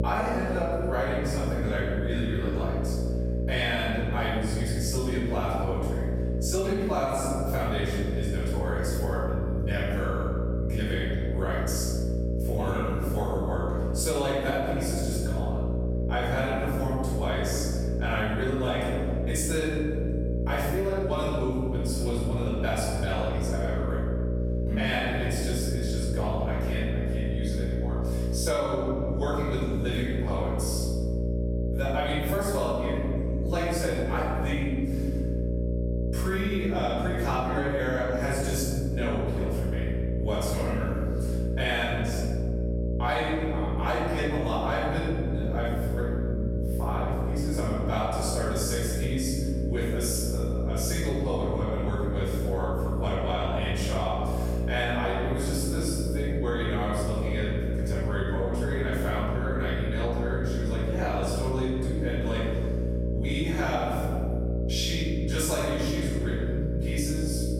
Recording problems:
room echo; strong; dies away in 1.4 s
off-mic speech; far
squashed, flat; somewhat
electrical hum; loud; throughout; 60 Hz, 7 dB below the speech

